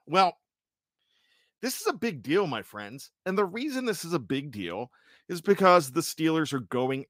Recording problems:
none

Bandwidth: 15.5 kHz